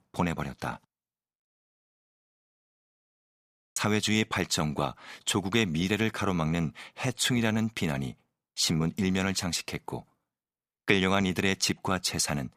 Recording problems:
audio cutting out; at 2.5 s for 1.5 s

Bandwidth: 15 kHz